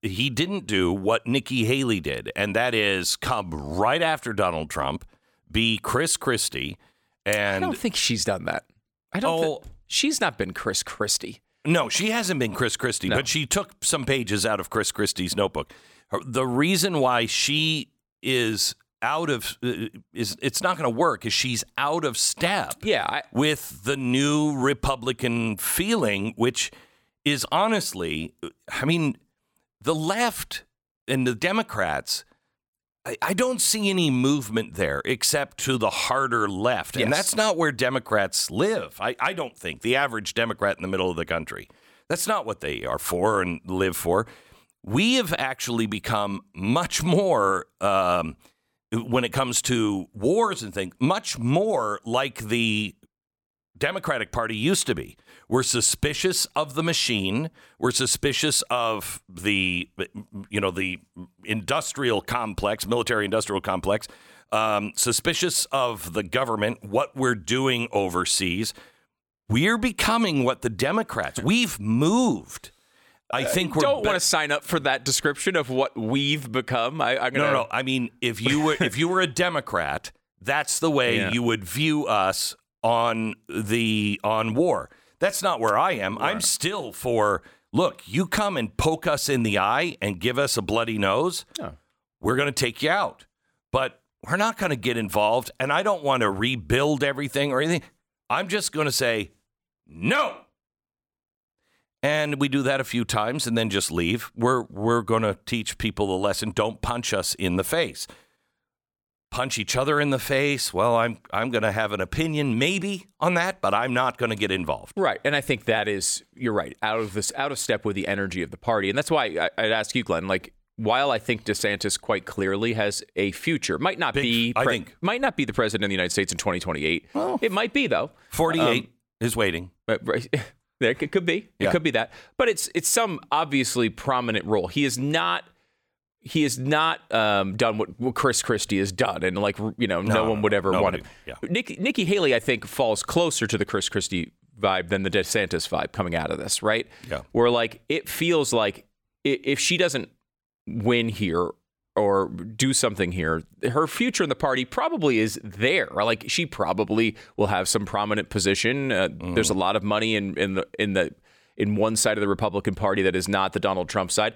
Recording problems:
none

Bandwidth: 17.5 kHz